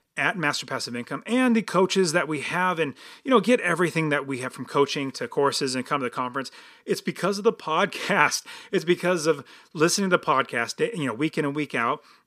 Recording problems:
none

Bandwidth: 15 kHz